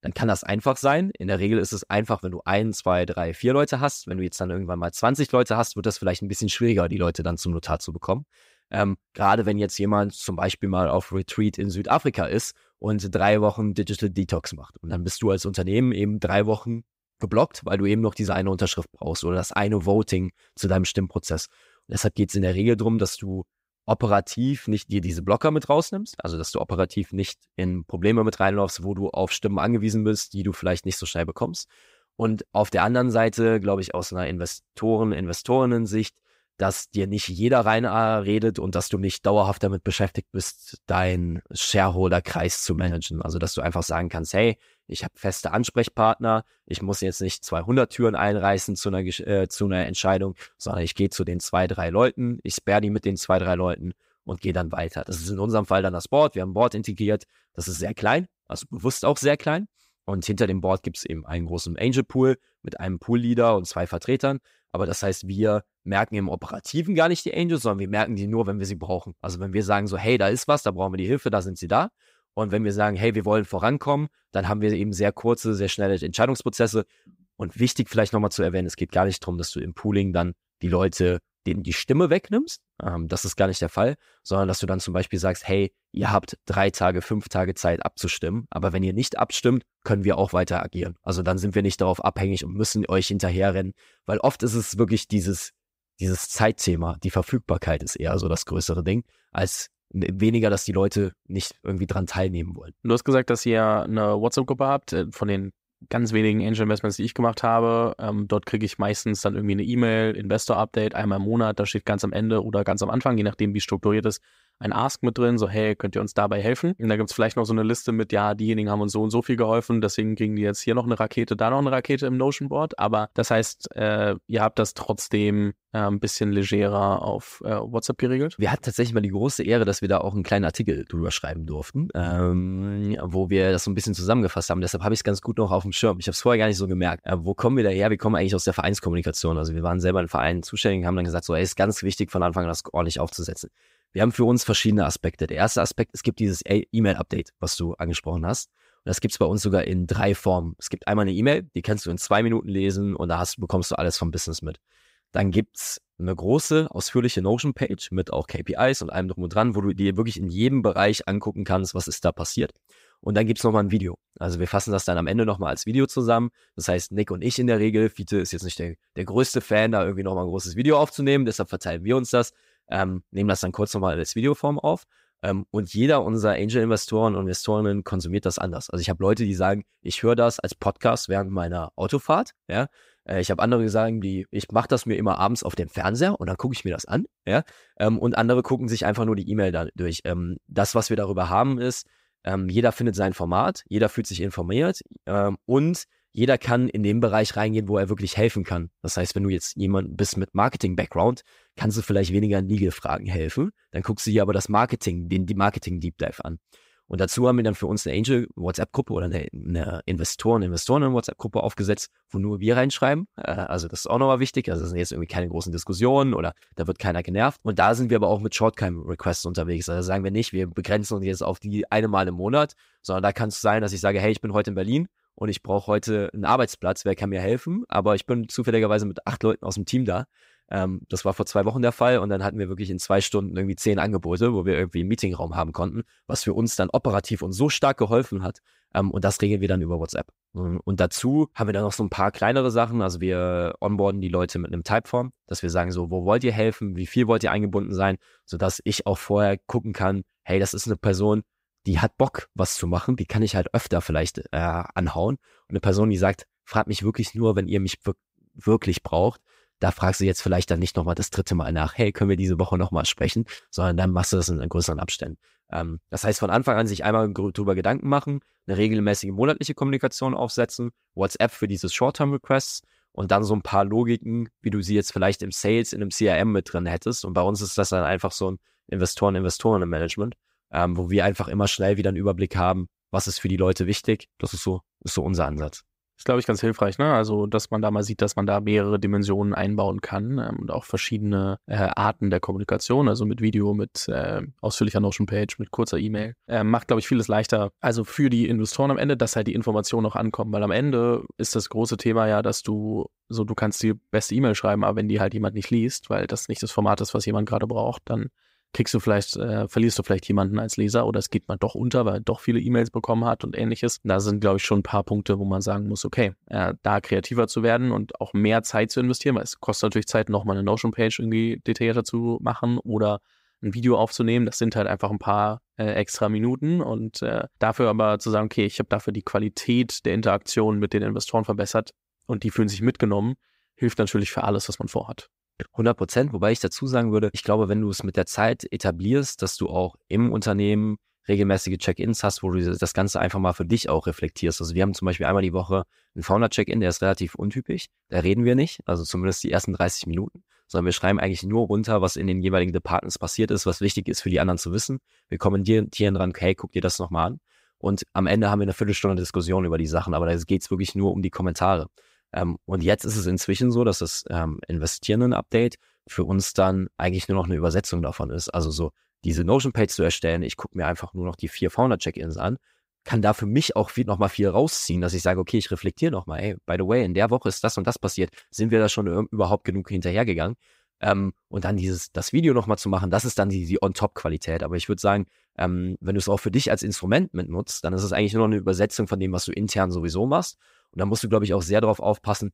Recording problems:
none

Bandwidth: 15.5 kHz